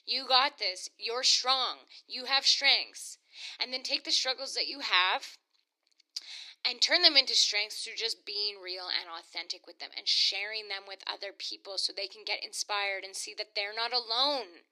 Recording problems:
thin; somewhat; fading below 300 Hz

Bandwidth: 14.5 kHz